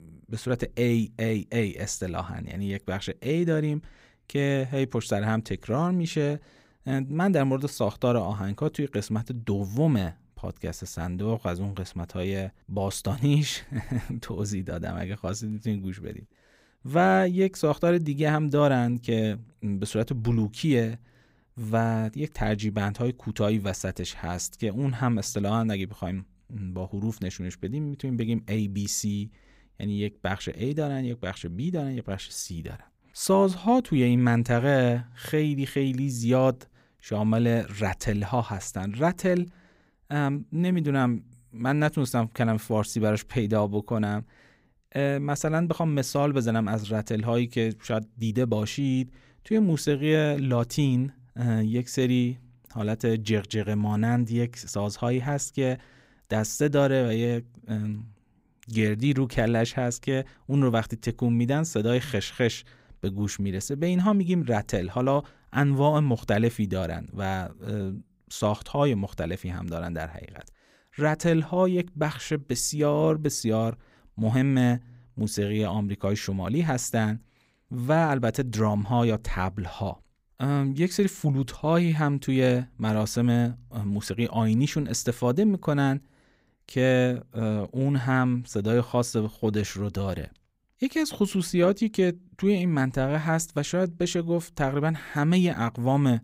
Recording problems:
none

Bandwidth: 15.5 kHz